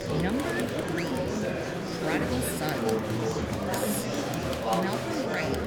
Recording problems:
murmuring crowd; very loud; throughout; 5 dB above the speech

